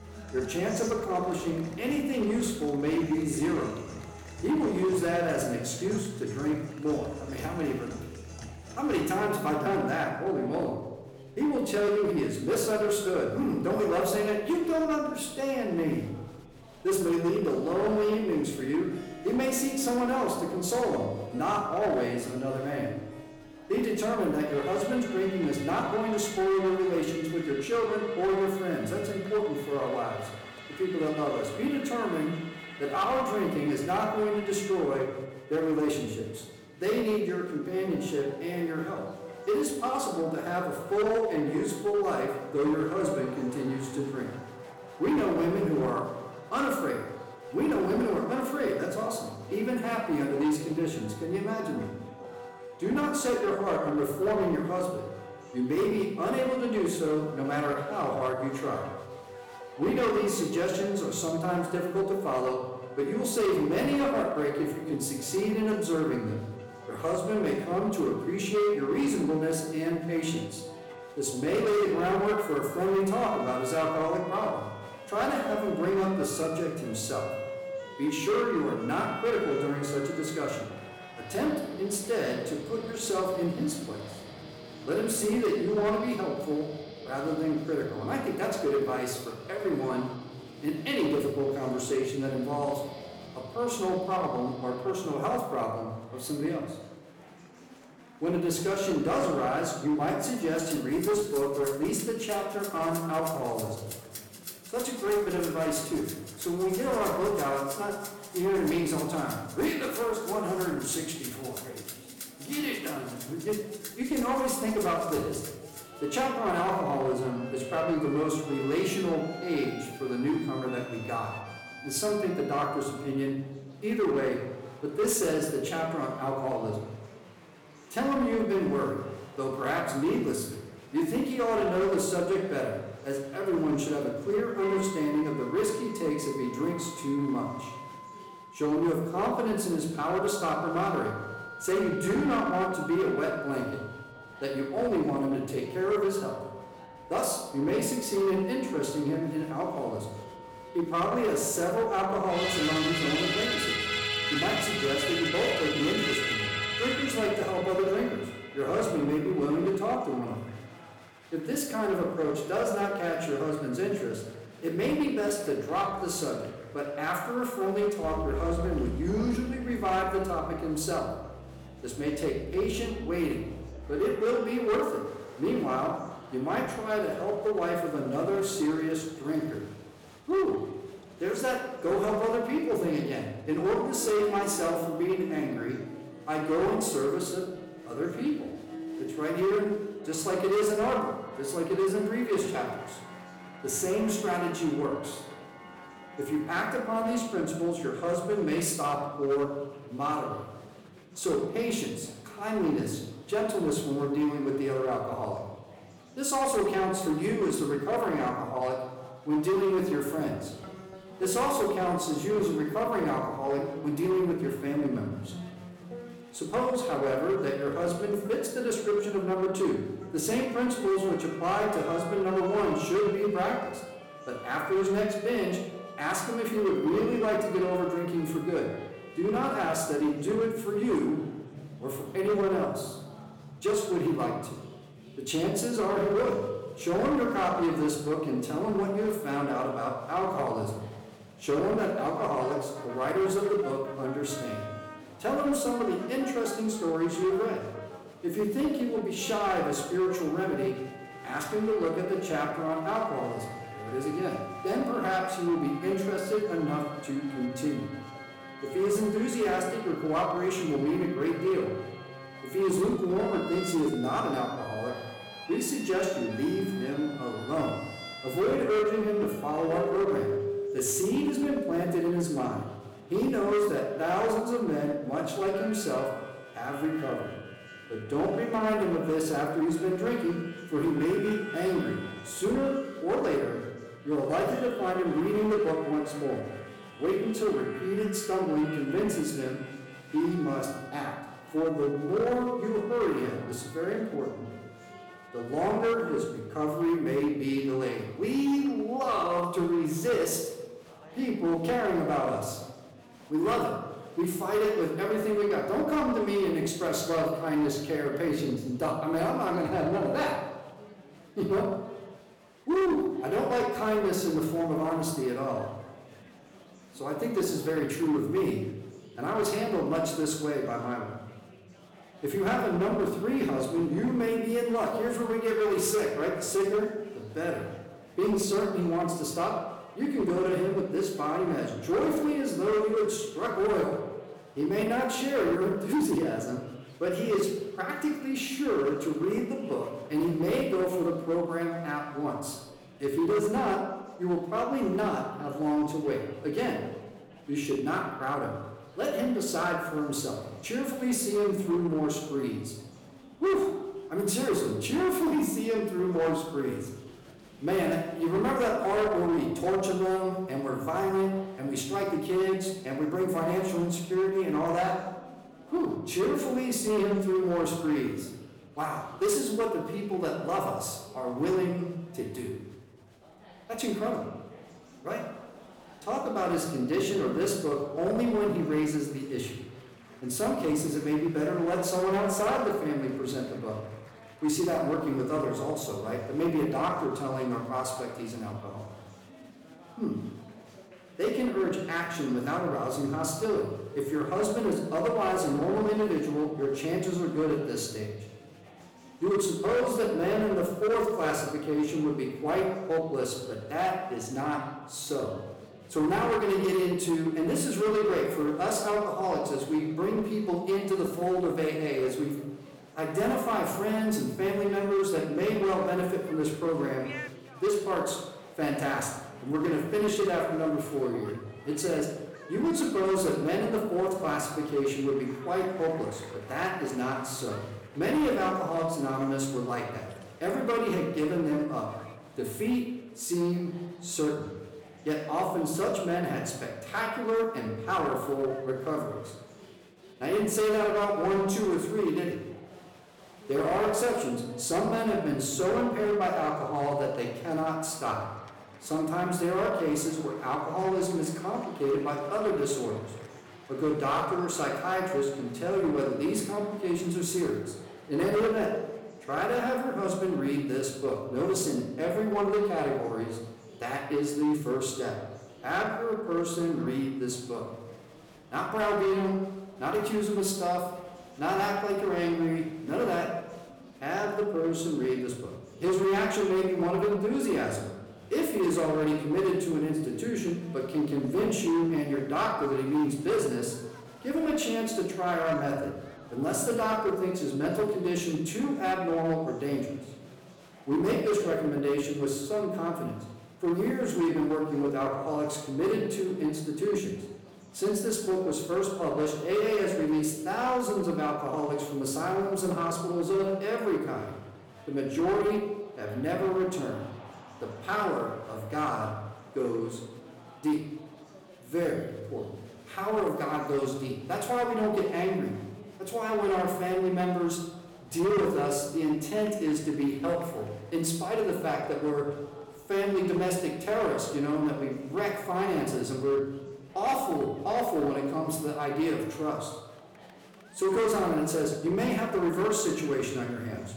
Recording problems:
off-mic speech; far
room echo; noticeable; dies away in 0.9 s
distortion; slight; 7% of the sound clipped
background music; noticeable; until 4:56; 10 dB below the speech
murmuring crowd; faint; throughout; 20 dB below the speech

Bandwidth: 18.5 kHz